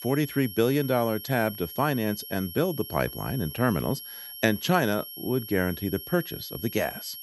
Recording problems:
high-pitched whine; noticeable; throughout; 11.5 kHz, 10 dB below the speech

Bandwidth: 15 kHz